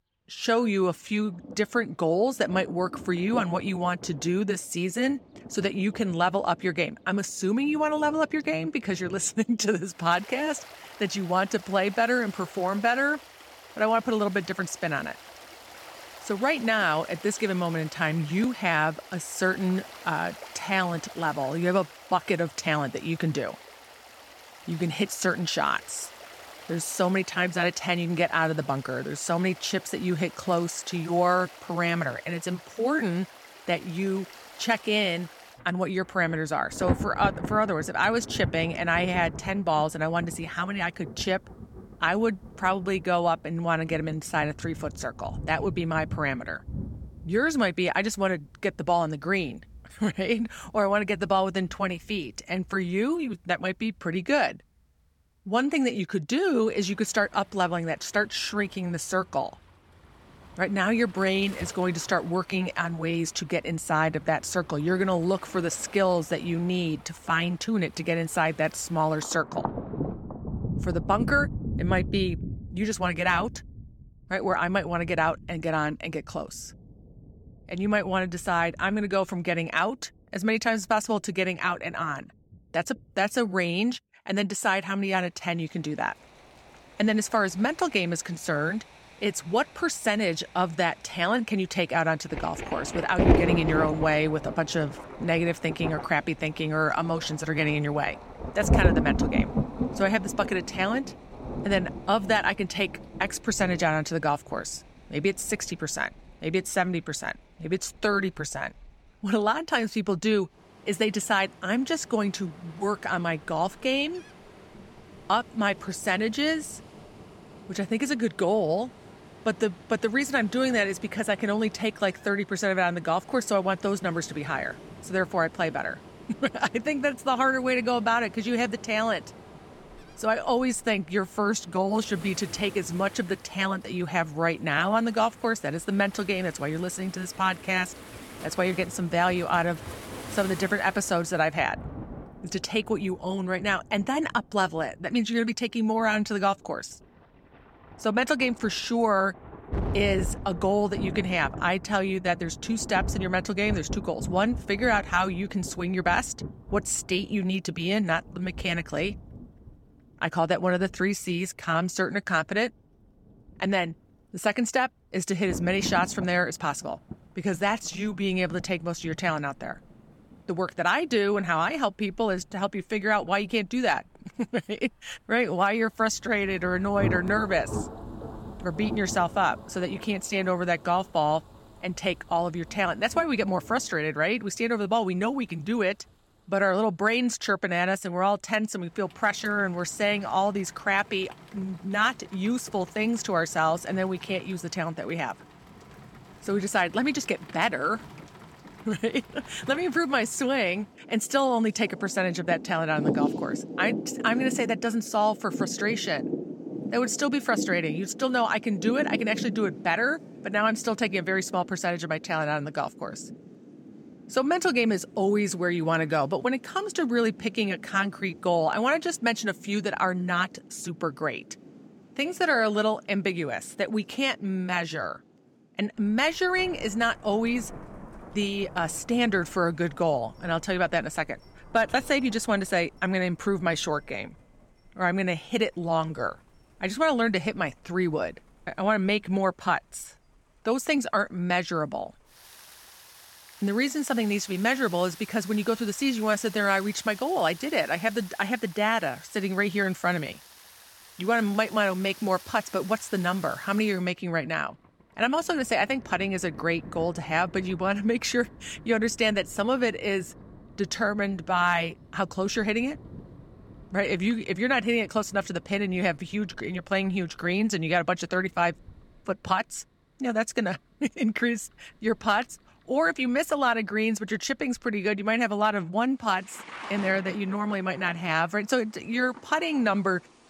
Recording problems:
rain or running water; noticeable; throughout; 10 dB below the speech

